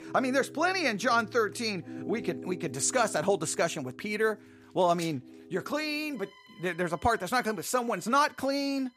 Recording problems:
background music; noticeable; throughout; 15 dB below the speech

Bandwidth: 15 kHz